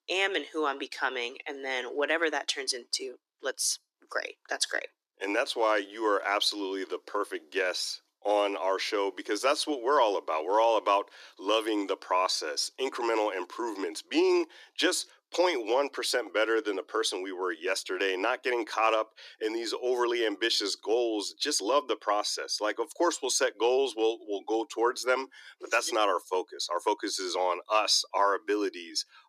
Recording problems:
thin; very; fading below 300 Hz

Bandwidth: 14.5 kHz